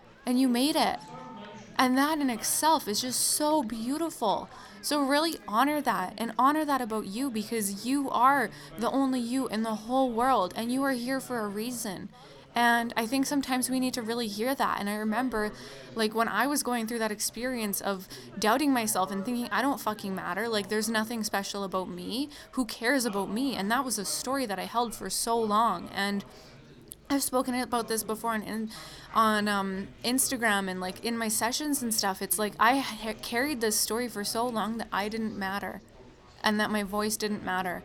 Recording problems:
chatter from many people; faint; throughout; 20 dB below the speech

